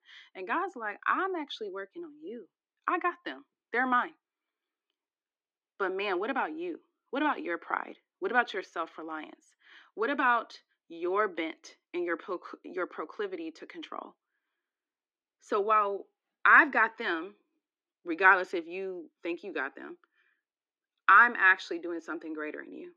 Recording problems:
muffled; slightly; fading above 2.5 kHz
thin; somewhat; fading below 300 Hz

